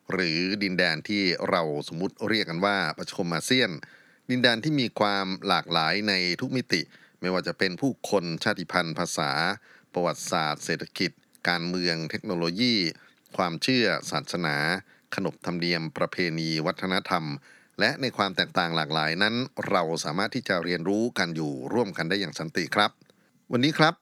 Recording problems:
none

